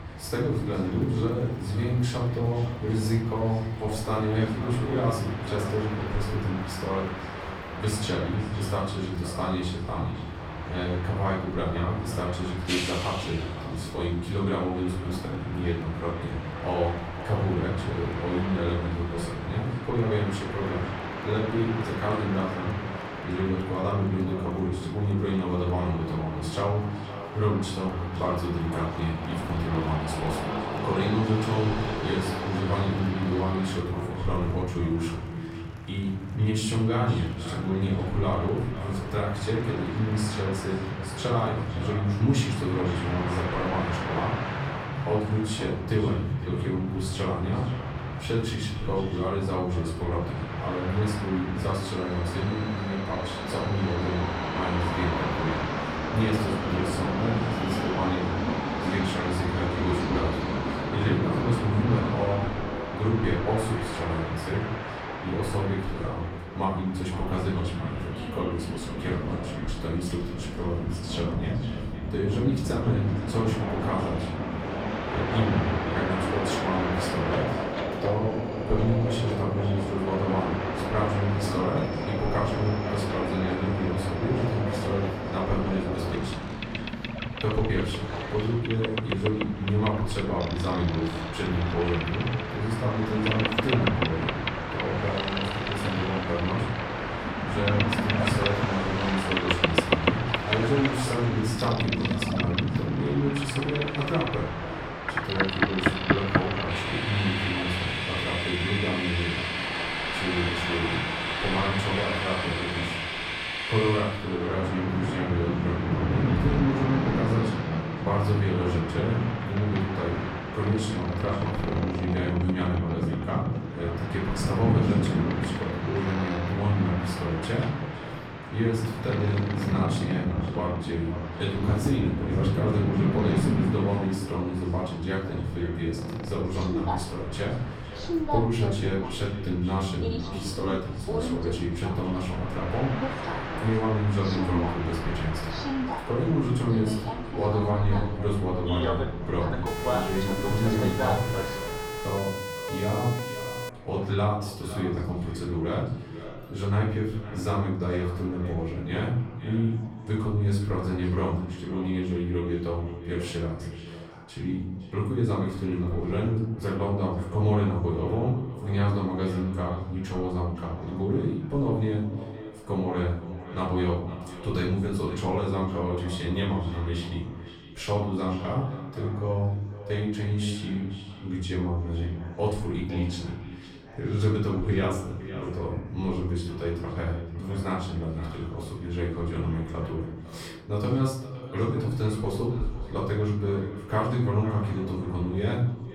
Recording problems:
off-mic speech; far
echo of what is said; noticeable; throughout; 510 ms later, 15 dB below the speech
room echo; noticeable; dies away in 0.7 s
train or aircraft noise; loud; until 2:32; 3 dB below the speech
chatter from many people; faint; throughout; 20 dB below the speech
siren; noticeable; from 2:30 to 2:34; peak 5 dB below the speech

